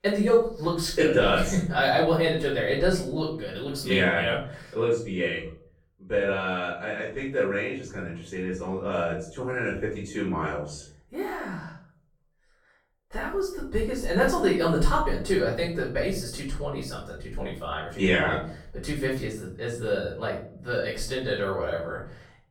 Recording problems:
off-mic speech; far
room echo; noticeable; dies away in 0.5 s

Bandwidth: 17 kHz